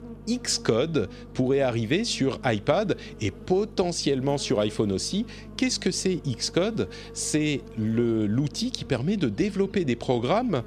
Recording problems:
electrical hum; noticeable; throughout; 50 Hz, 20 dB below the speech

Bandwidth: 14 kHz